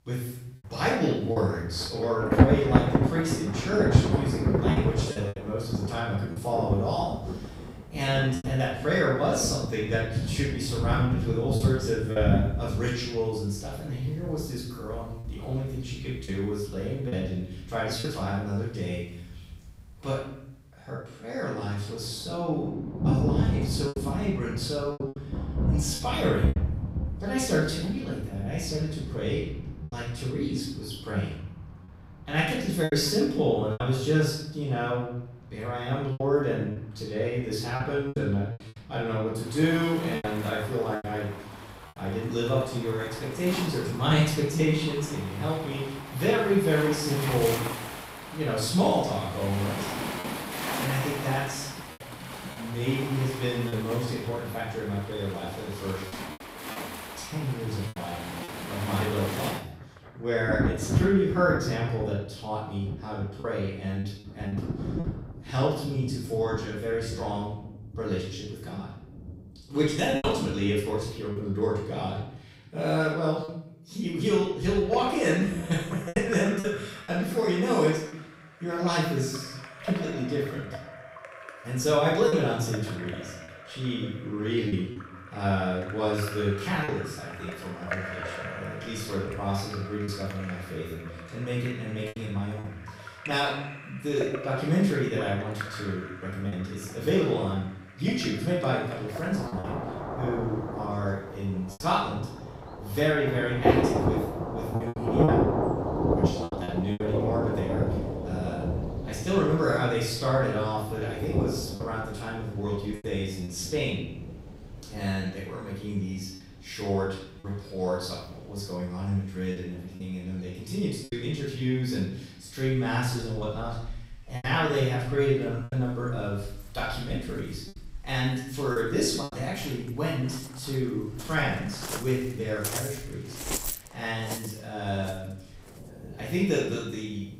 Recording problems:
off-mic speech; far
room echo; noticeable; dies away in 0.7 s
rain or running water; loud; throughout; 4 dB below the speech
choppy; occasionally; 3% of the speech affected

